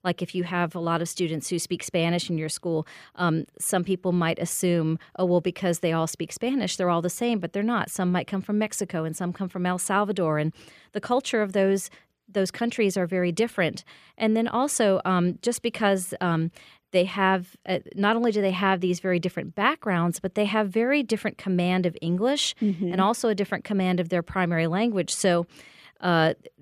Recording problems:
none

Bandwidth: 14.5 kHz